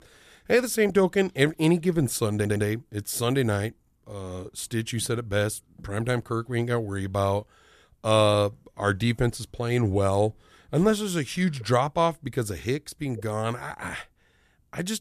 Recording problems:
audio stuttering; at 2.5 s

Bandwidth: 14.5 kHz